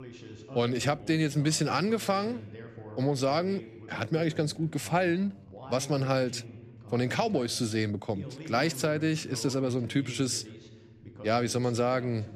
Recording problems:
voice in the background; noticeable; throughout; 15 dB below the speech

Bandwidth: 14.5 kHz